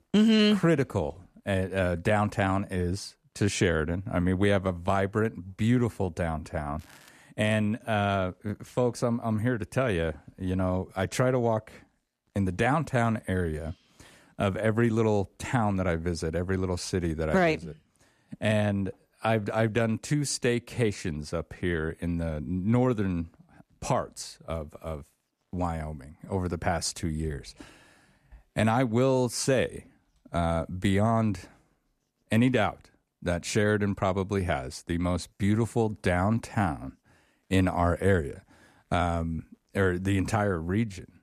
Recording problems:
crackling; faint; at 7 s, mostly in the pauses; 30 dB below the speech

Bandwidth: 14.5 kHz